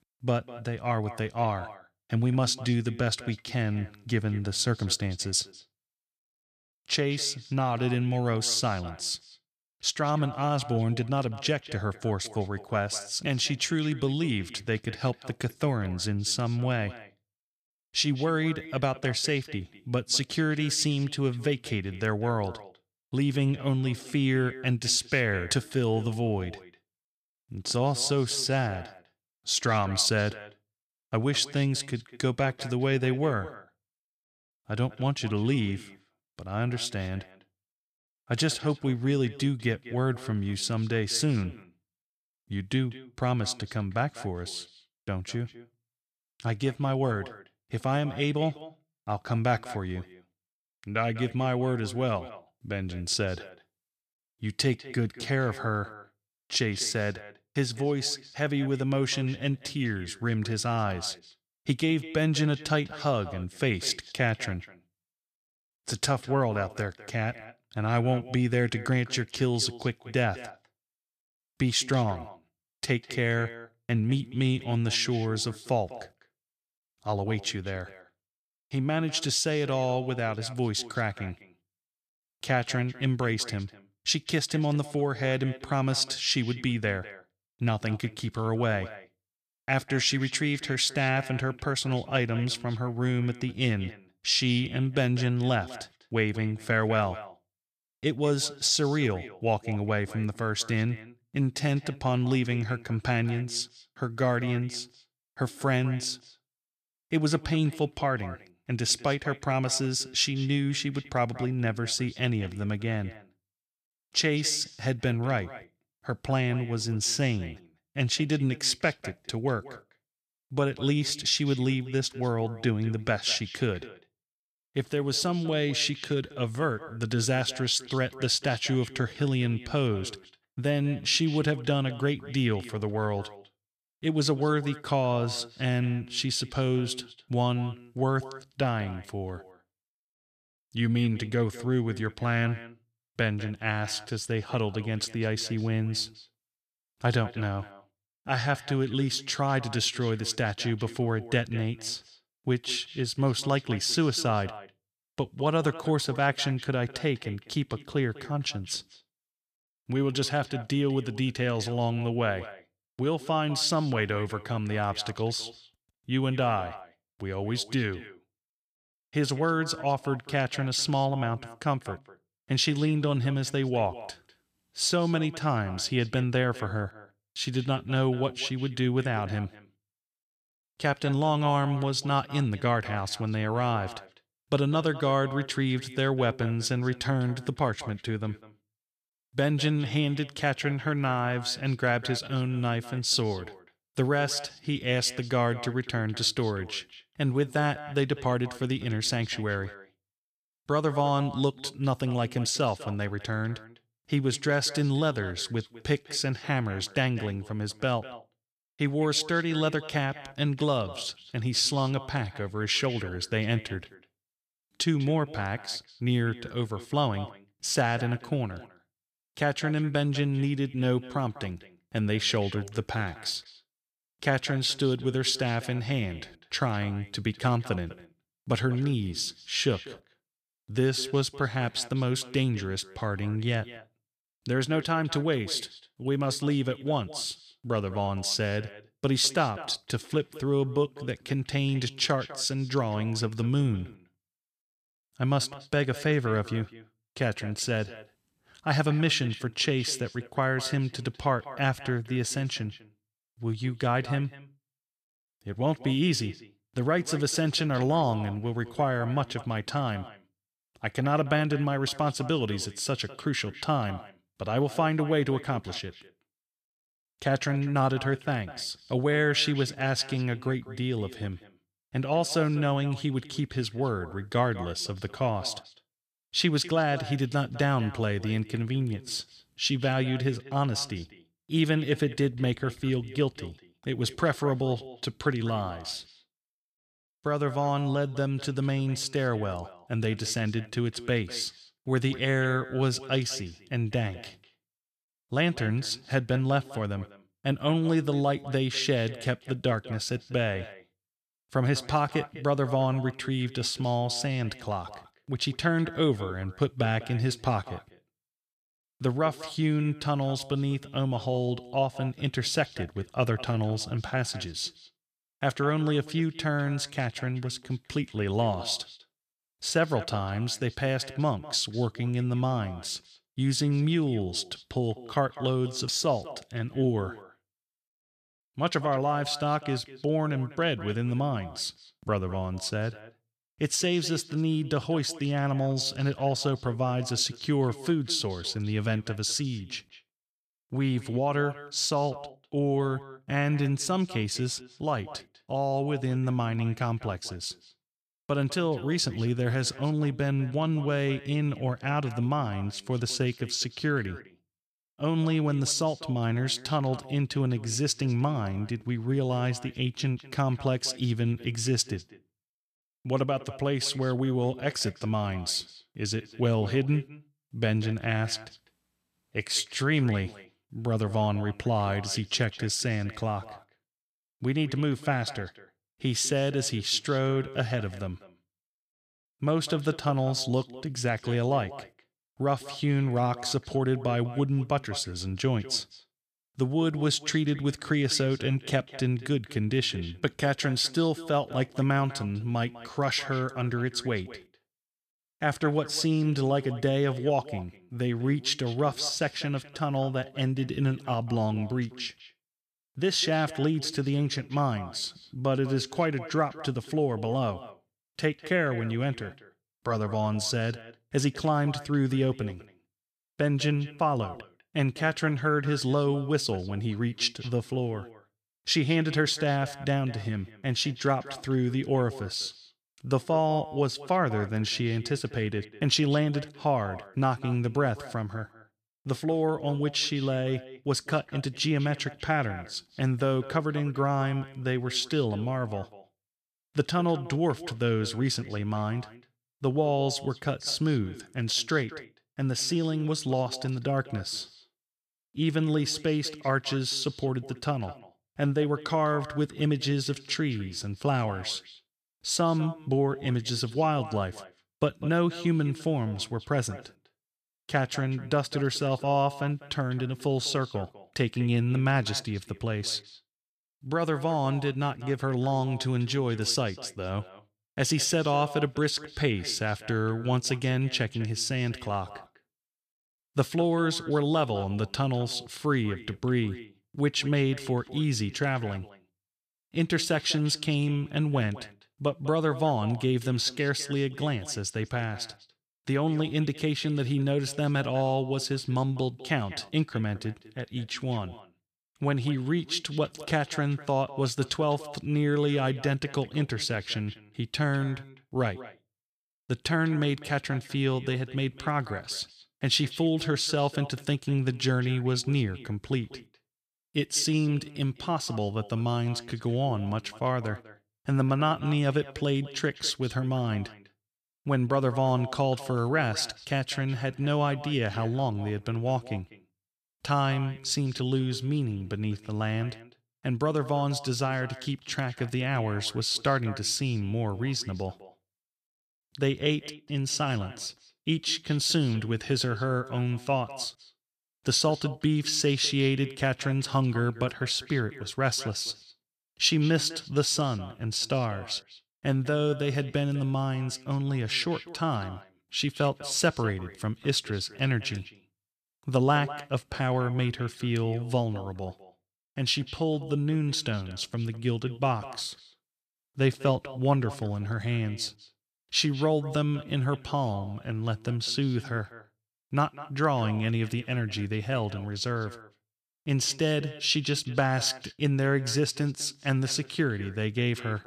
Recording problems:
echo of what is said; noticeable; throughout; 200 ms later, 20 dB below the speech

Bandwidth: 14.5 kHz